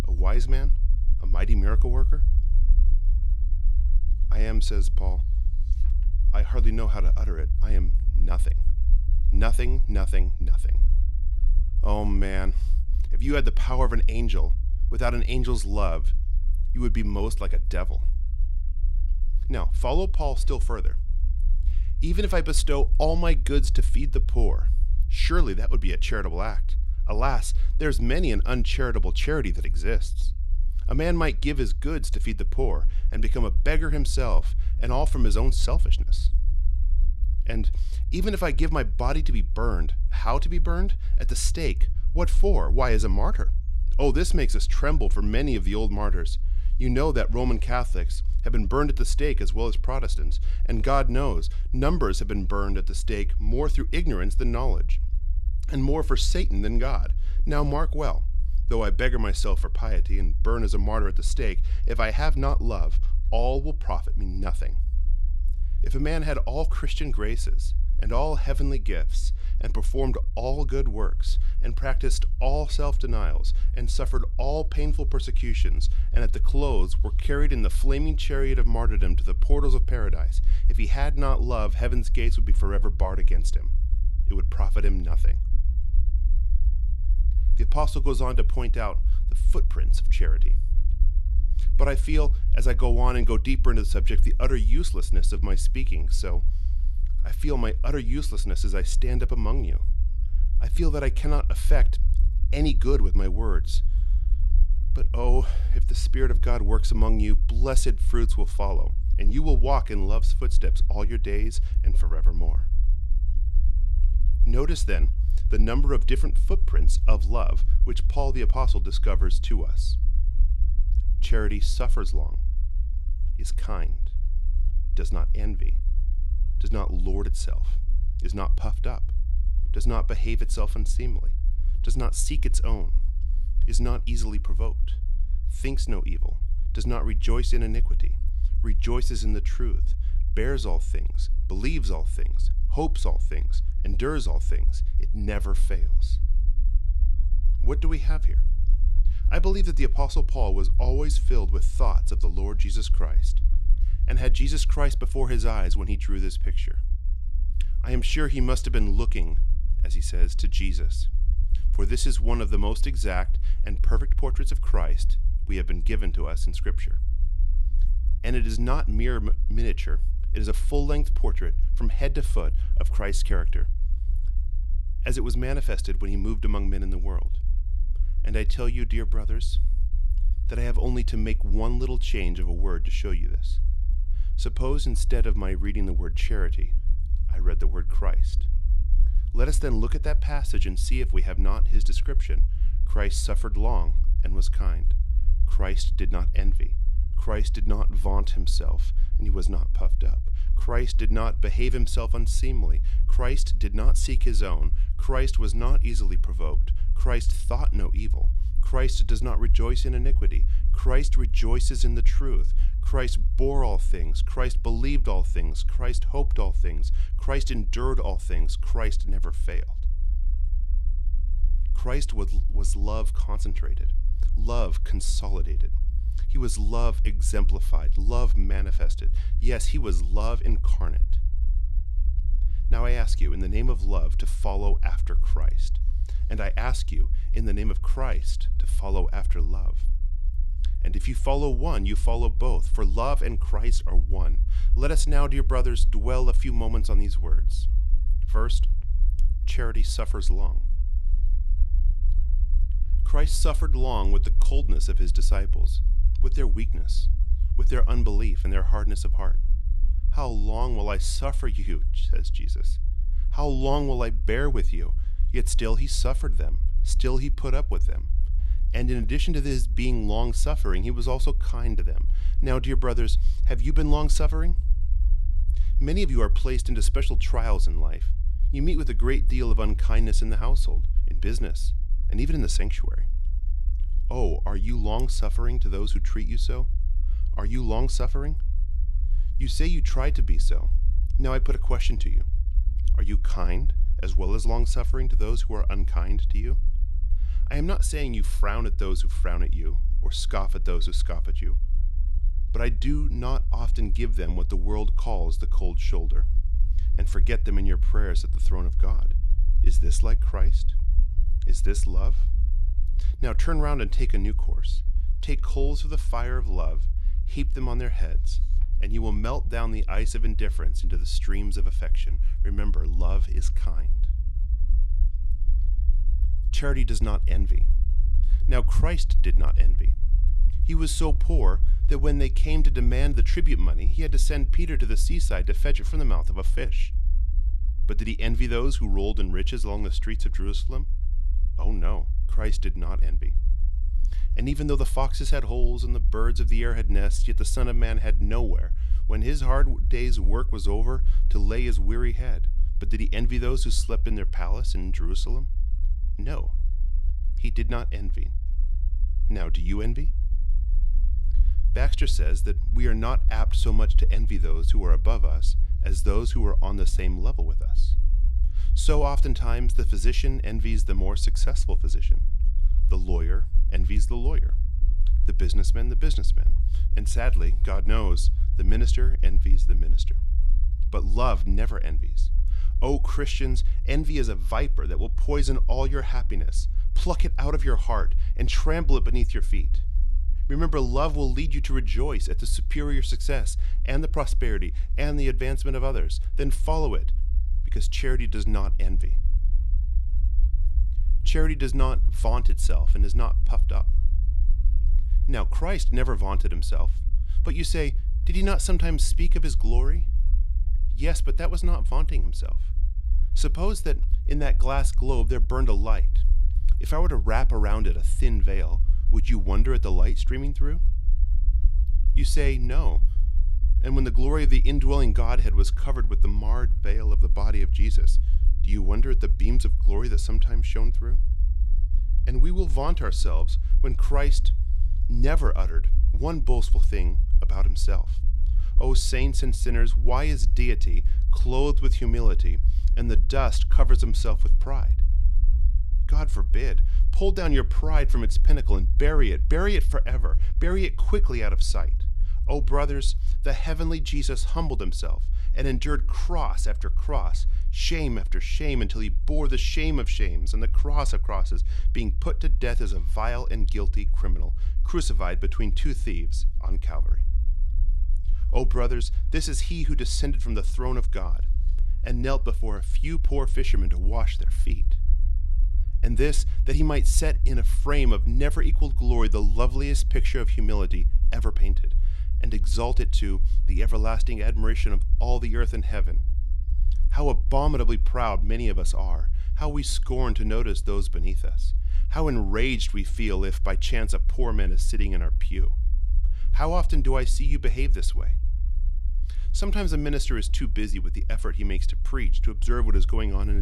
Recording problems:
low rumble; noticeable; throughout; 15 dB below the speech
abrupt cut into speech; at the end

